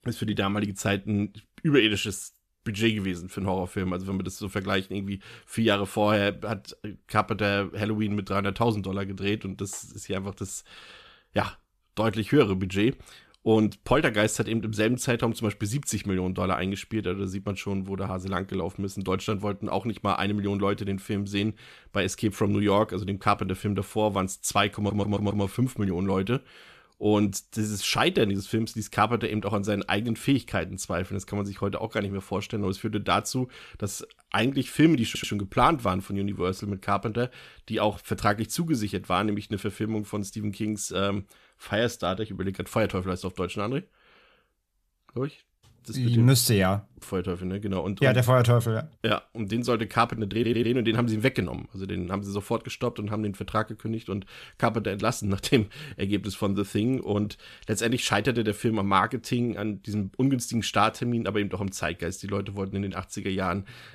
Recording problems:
audio stuttering; at 25 s, at 35 s and at 50 s

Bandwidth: 14.5 kHz